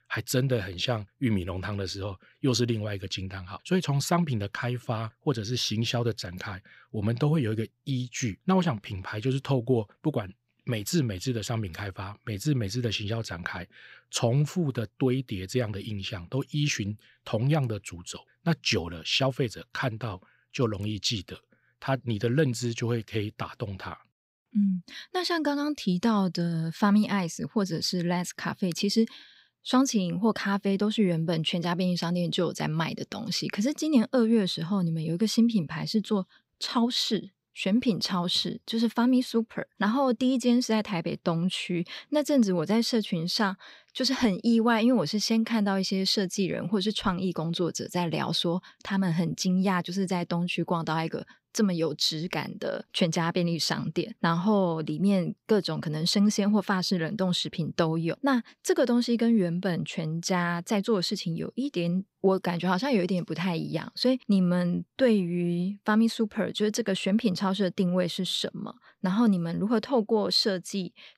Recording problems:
none

